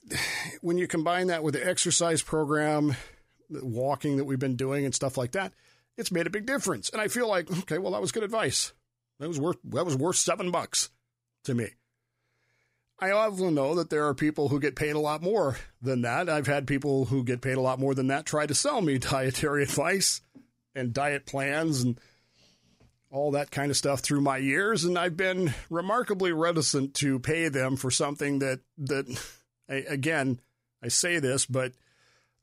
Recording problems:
none

